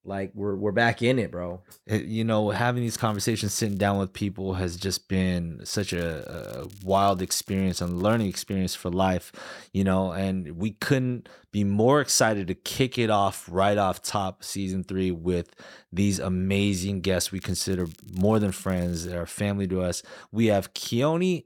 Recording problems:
crackling; faint; from 3 to 4 s, from 5.5 to 8.5 s and from 17 to 19 s; 25 dB below the speech

